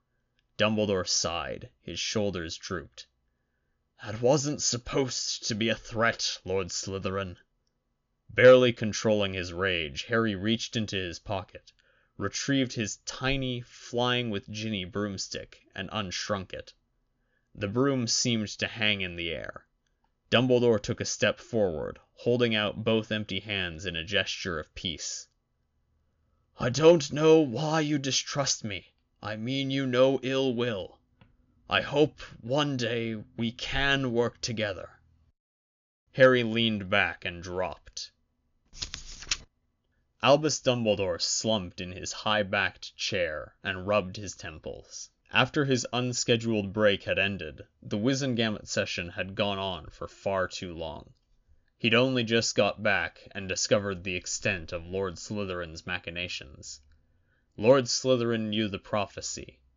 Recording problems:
high frequencies cut off; noticeable; nothing above 7 kHz

